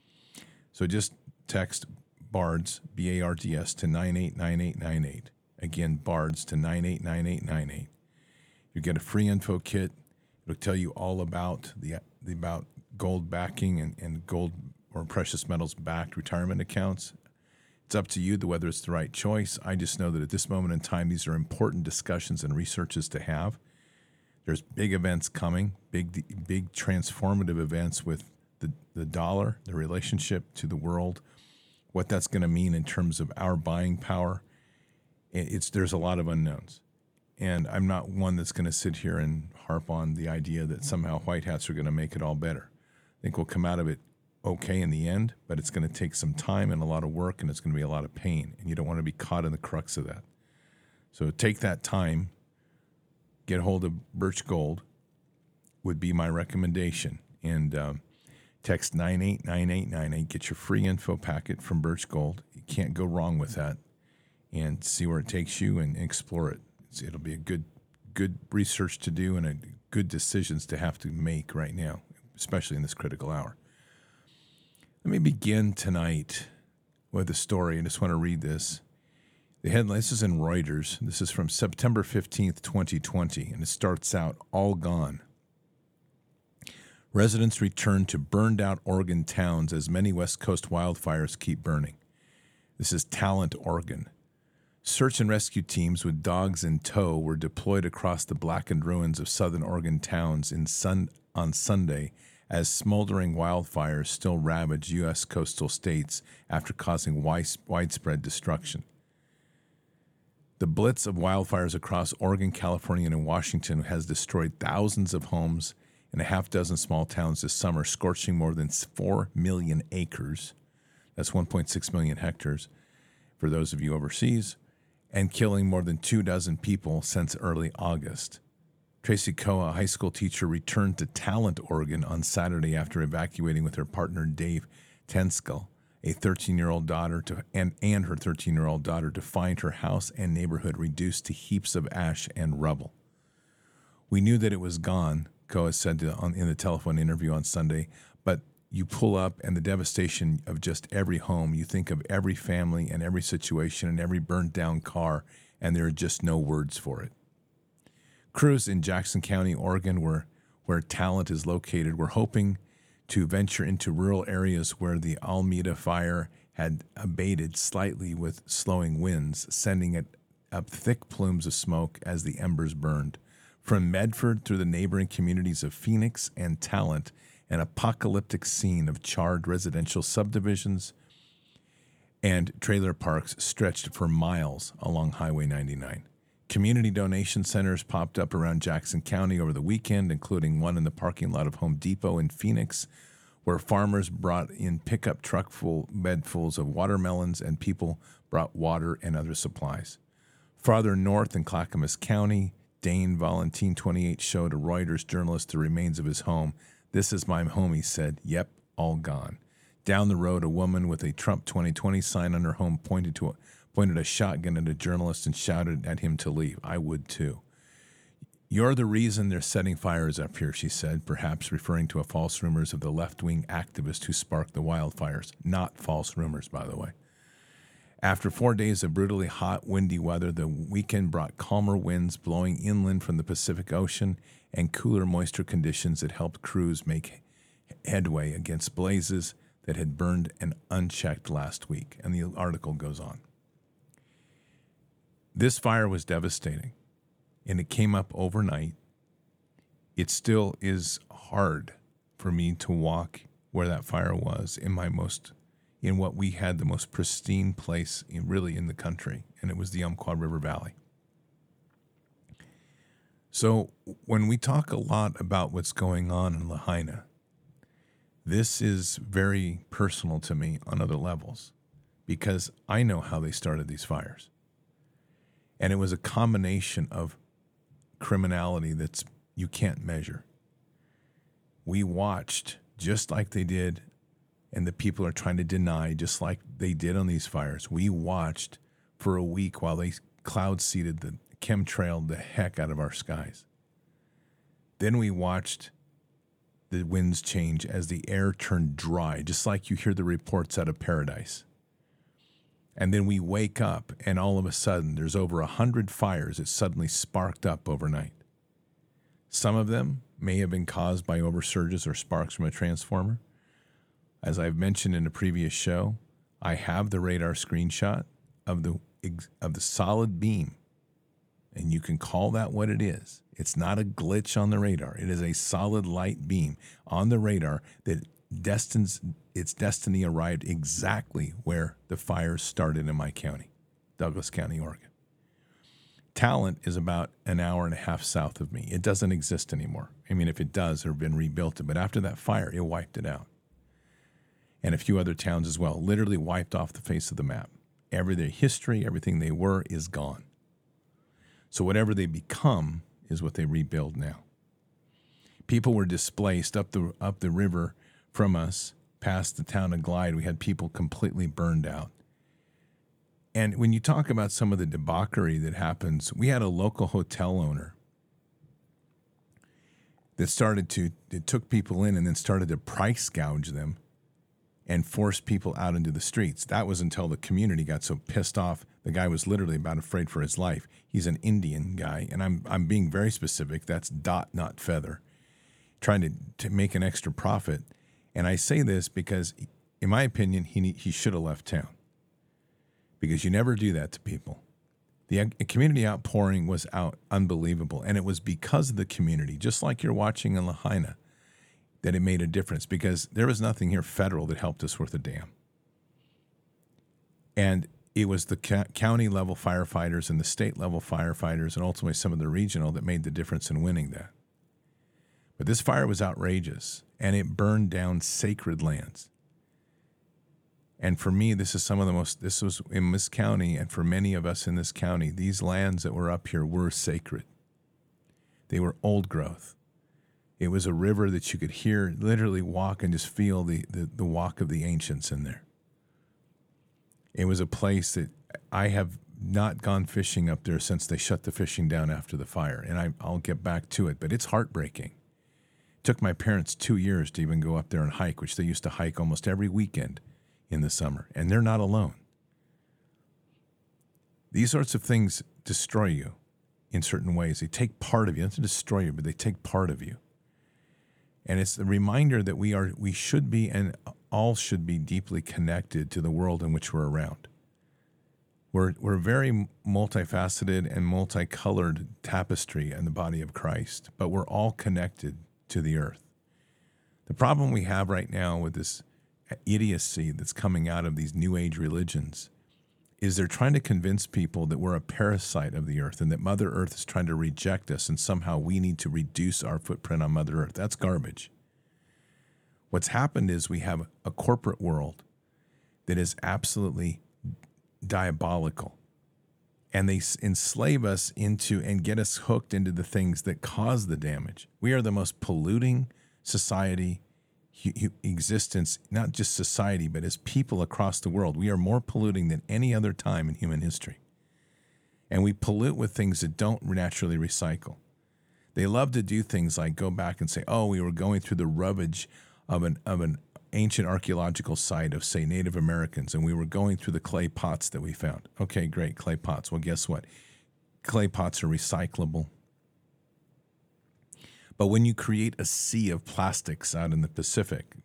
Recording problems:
none

